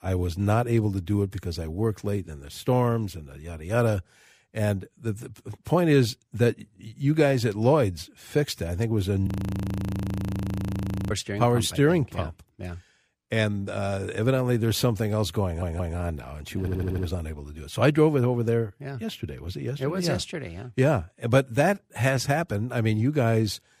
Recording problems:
audio freezing; at 9.5 s for 2 s
audio stuttering; at 15 s and at 17 s

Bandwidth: 15 kHz